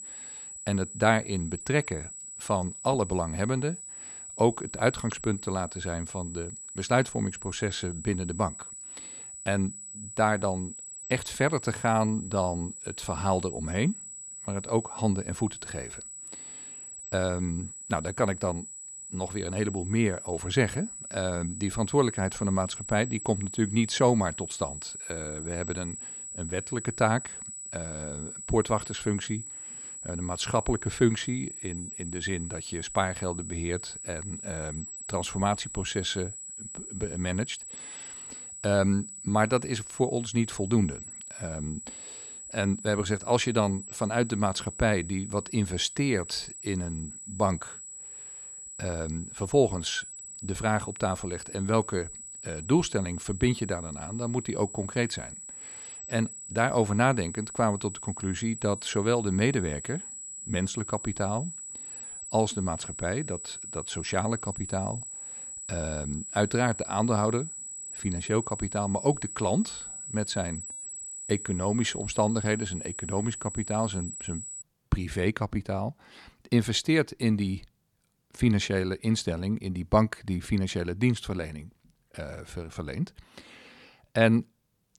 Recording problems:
high-pitched whine; loud; until 1:15; 8 kHz, 9 dB below the speech

